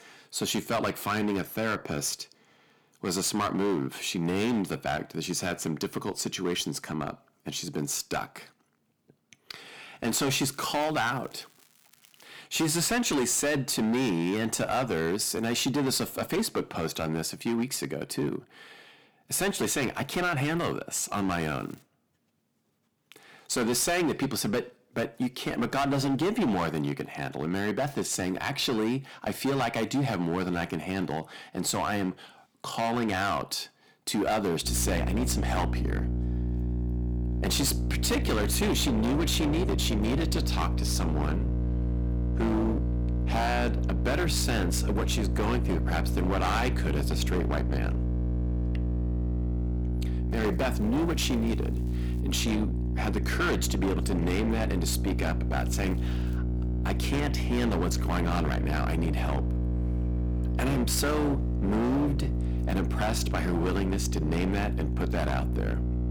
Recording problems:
distortion; heavy; 17% of the sound clipped
electrical hum; loud; from 35 s on; 60 Hz, 9 dB below the speech
crackling; faint; 4 times, first at 11 s; 30 dB below the speech

